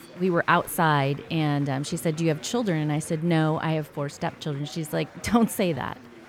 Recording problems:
chatter from many people; faint; throughout; 20 dB below the speech

